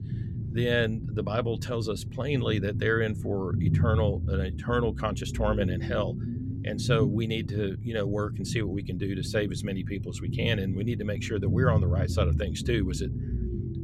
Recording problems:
low rumble; noticeable; throughout; 10 dB below the speech

